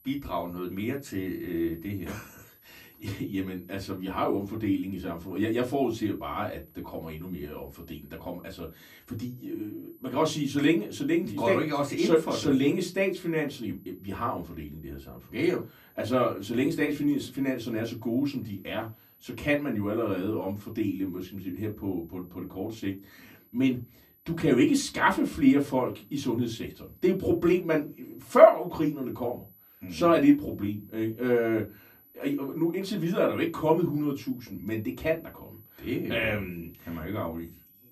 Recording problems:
off-mic speech; far
room echo; very slight; dies away in 0.2 s
high-pitched whine; faint; throughout; 12 kHz, 30 dB below the speech

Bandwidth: 15 kHz